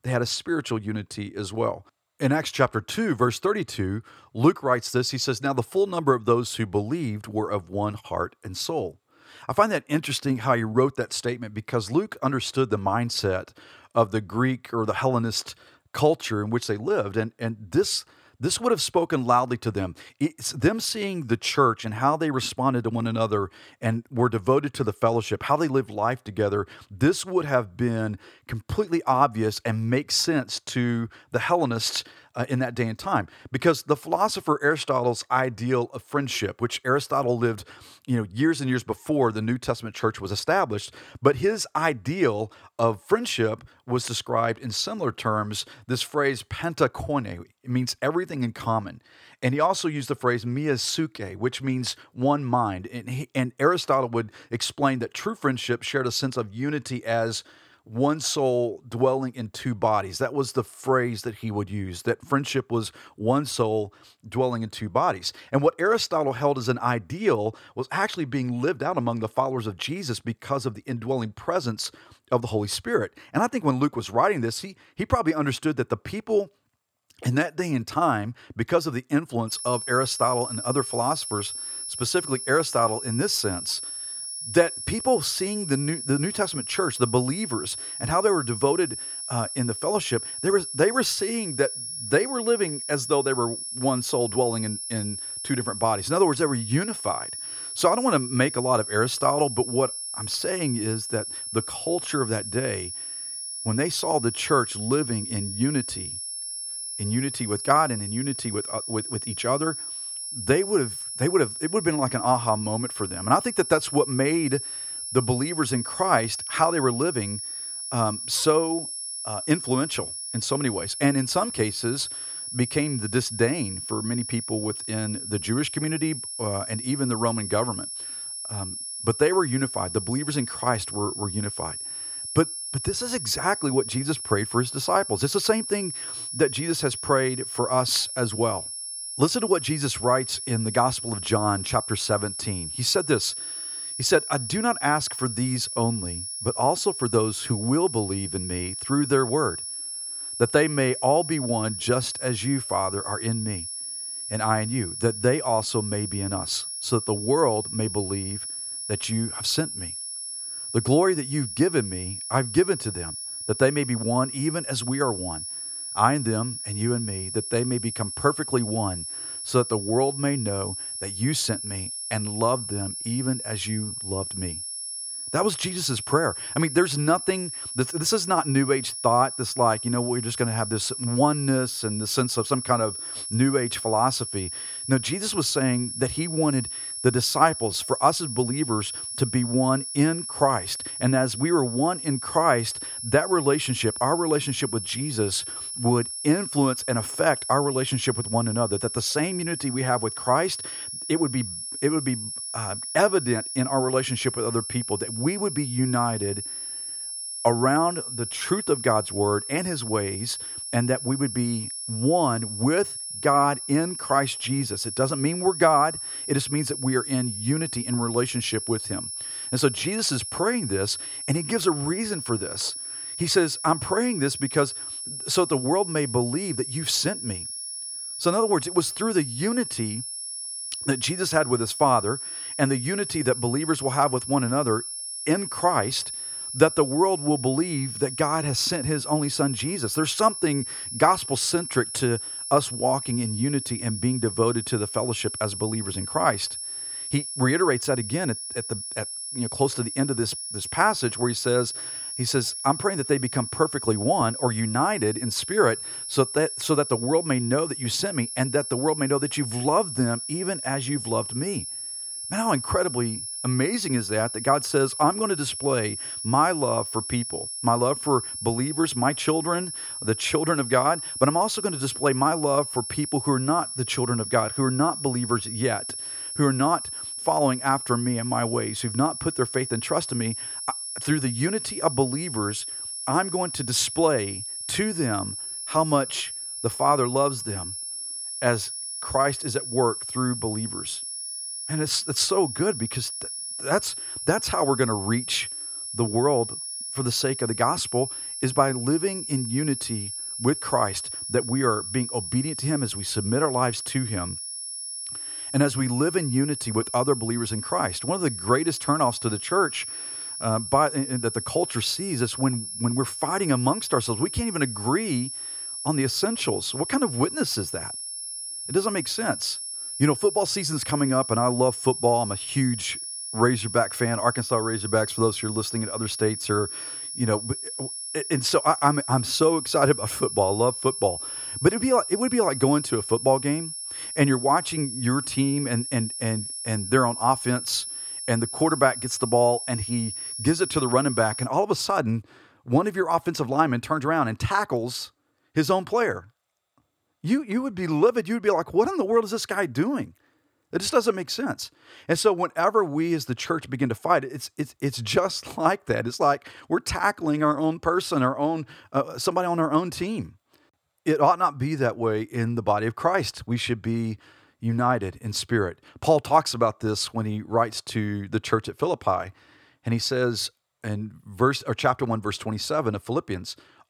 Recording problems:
high-pitched whine; loud; from 1:19 to 5:41; 10.5 kHz, 6 dB below the speech

